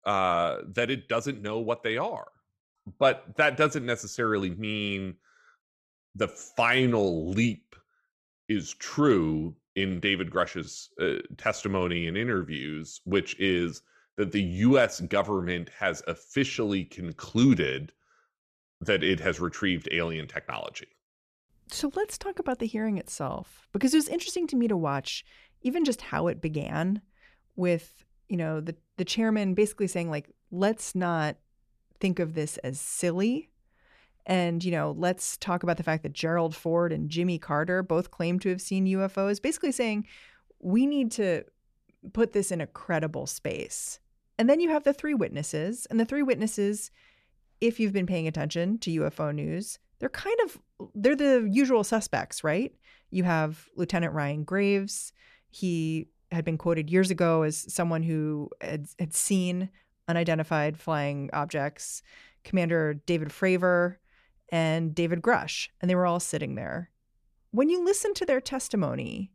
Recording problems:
none

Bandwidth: 14.5 kHz